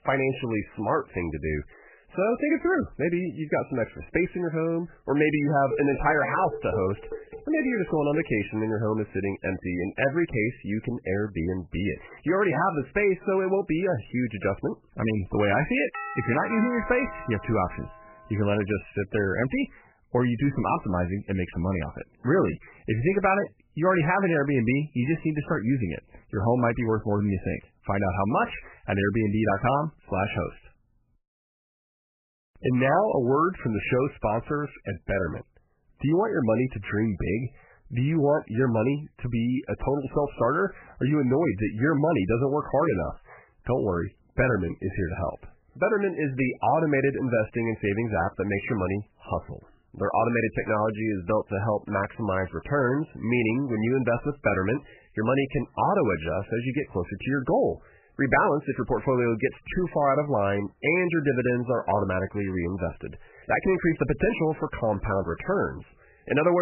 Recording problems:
garbled, watery; badly; nothing above 3 kHz
clattering dishes; noticeable; from 5.5 to 8.5 s; peak 7 dB below the speech
doorbell; noticeable; from 16 to 18 s; peak 7 dB below the speech
abrupt cut into speech; at the end

